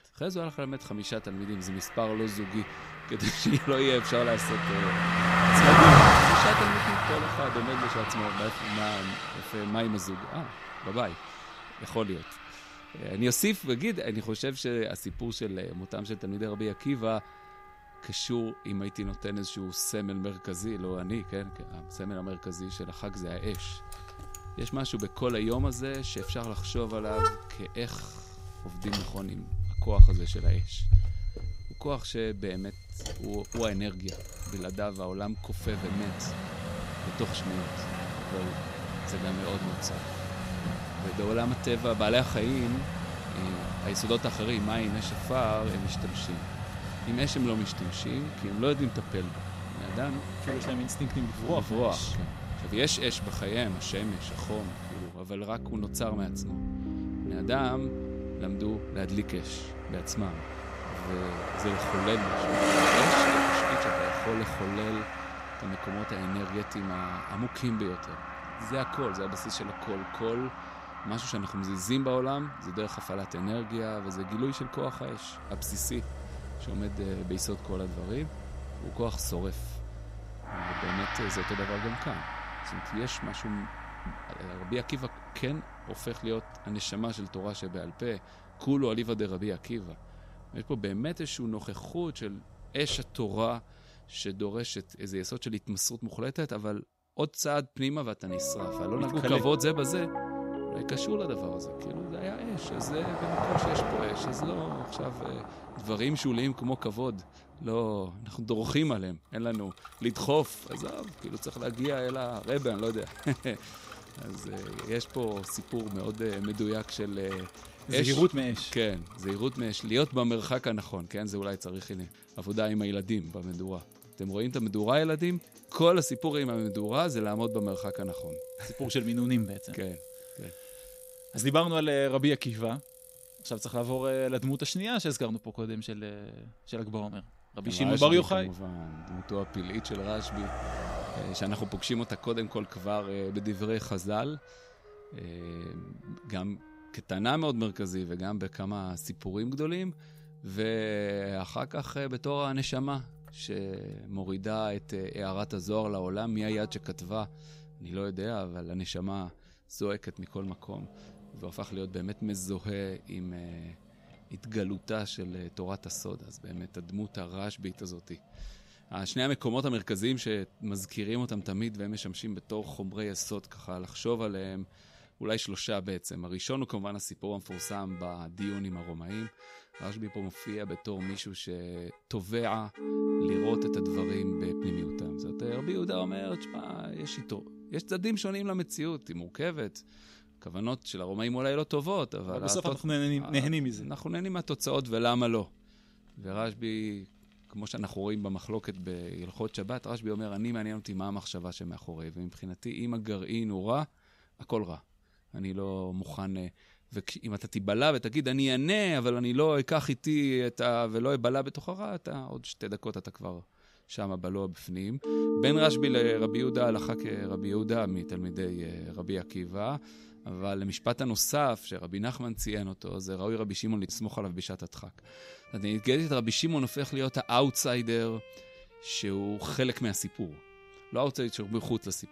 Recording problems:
traffic noise; very loud; throughout; 2 dB above the speech
background music; loud; throughout; 9 dB below the speech

